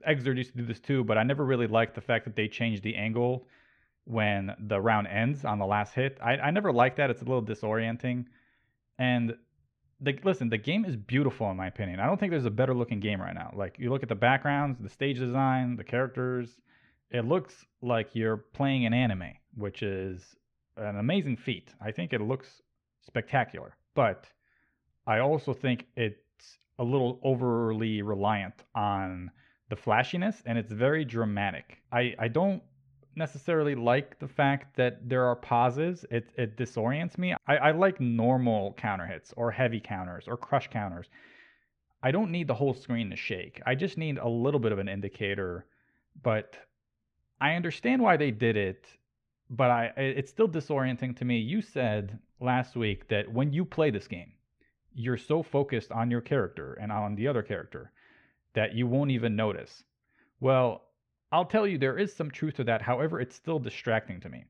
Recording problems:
muffled; slightly; fading above 2.5 kHz

